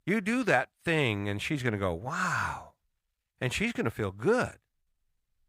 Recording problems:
none

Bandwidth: 15.5 kHz